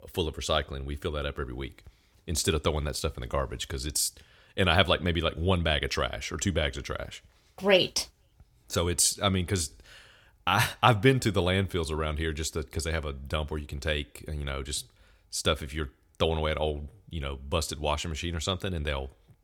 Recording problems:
none

